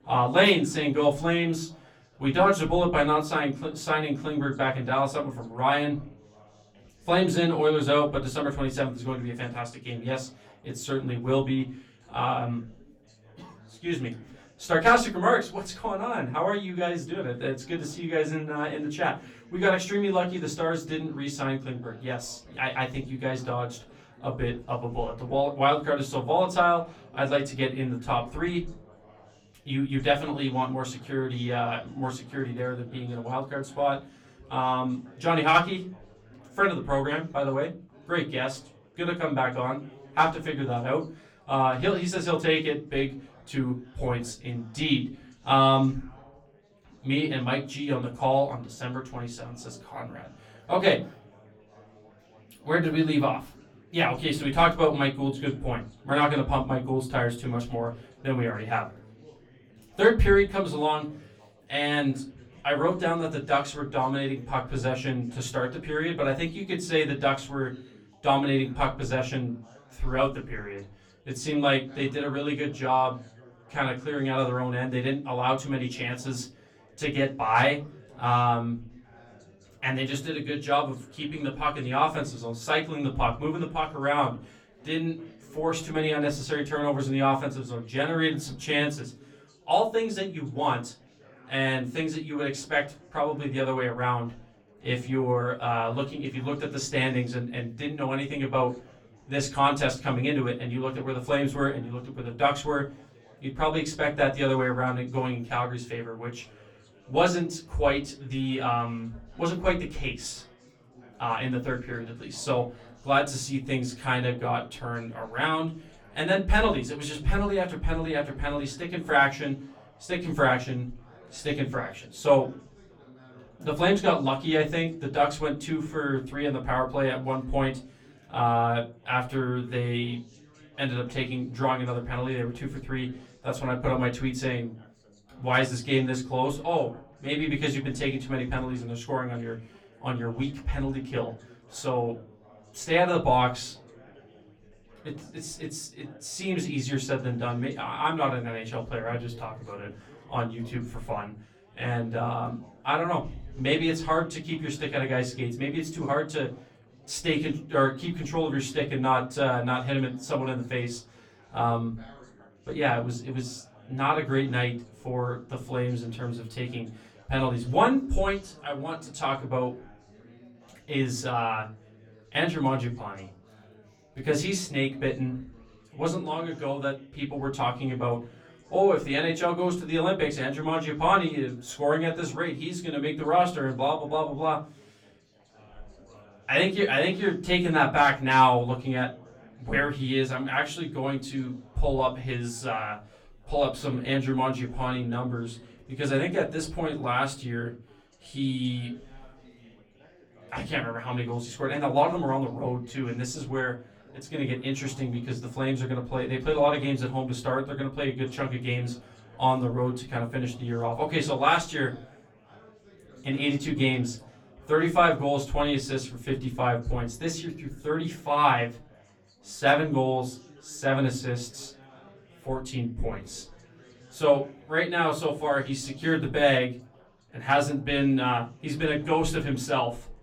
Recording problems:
off-mic speech; far
room echo; very slight; dies away in 0.3 s
chatter from many people; faint; throughout; 25 dB below the speech

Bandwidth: 17.5 kHz